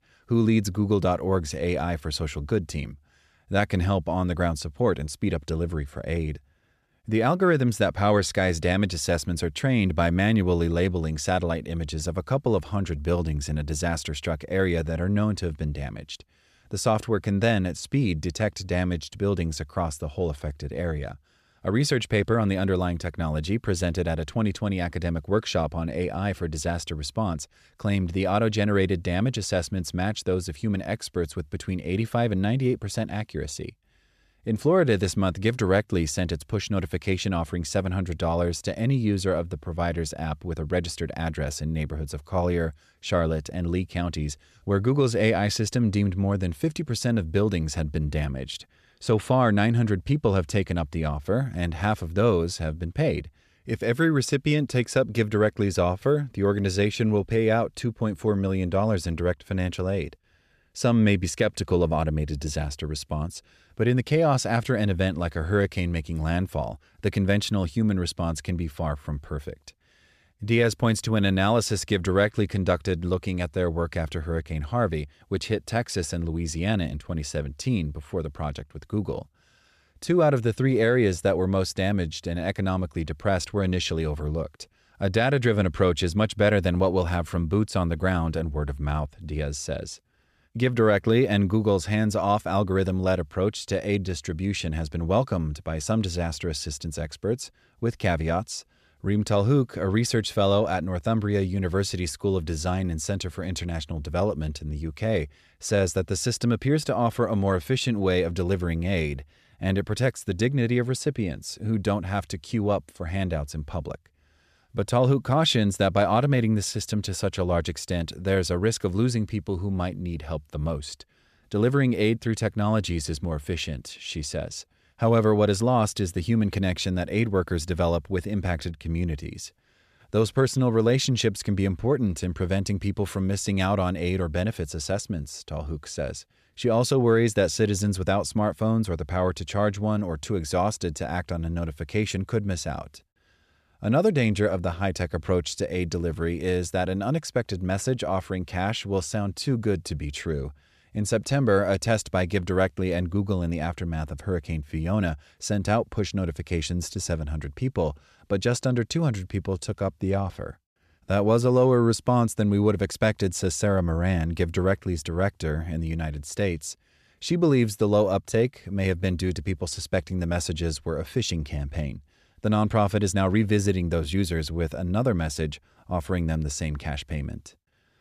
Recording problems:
none

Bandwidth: 14.5 kHz